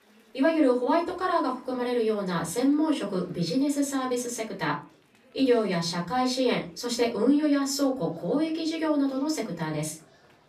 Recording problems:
off-mic speech; far
room echo; very slight; dies away in 0.3 s
chatter from many people; faint; throughout; 30 dB below the speech

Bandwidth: 15.5 kHz